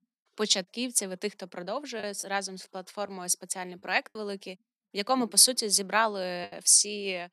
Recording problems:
choppy; occasionally; 3% of the speech affected

